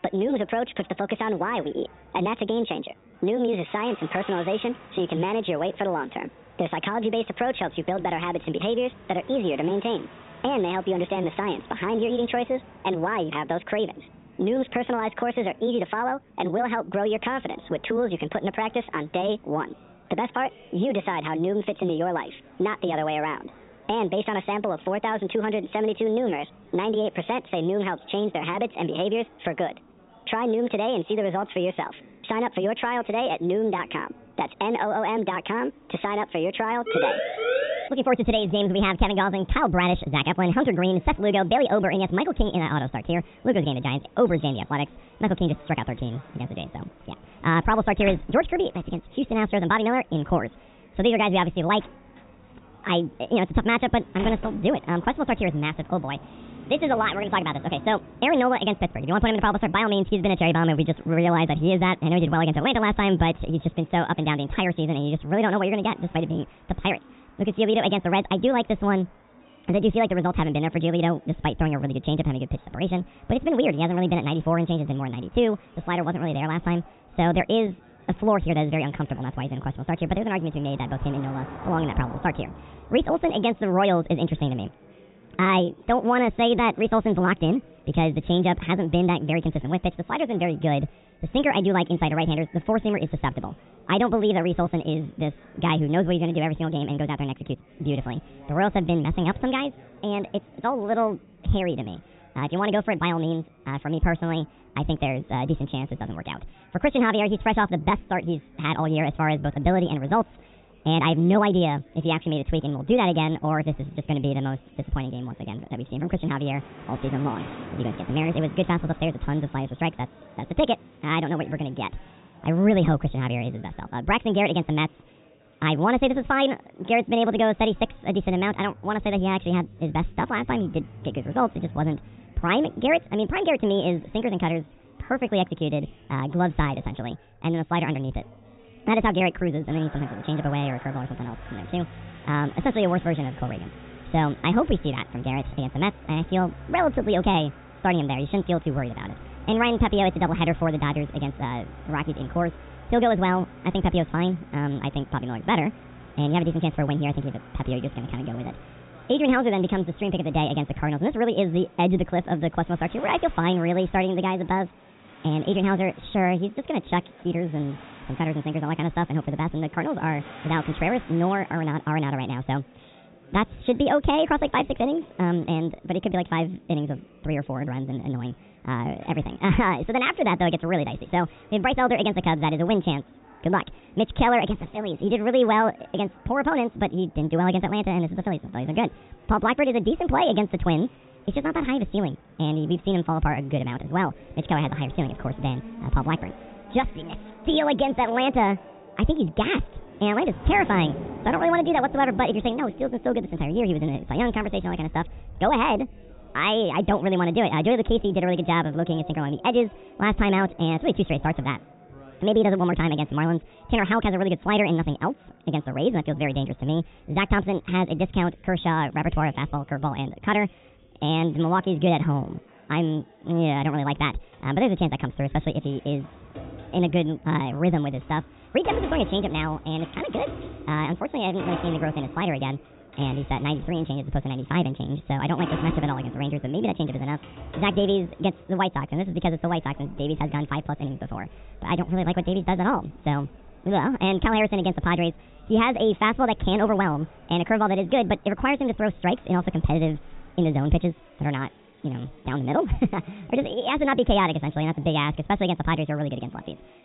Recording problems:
high frequencies cut off; severe; nothing above 4 kHz
wrong speed and pitch; too fast and too high; 1.5 times normal speed
traffic noise; noticeable; throughout; 20 dB below the speech
background chatter; faint; throughout; 4 voices, 30 dB below the speech
siren; loud; from 37 to 38 s; peak level with the speech
door banging; noticeable; from 48 to 55 s; peak 9 dB below the speech

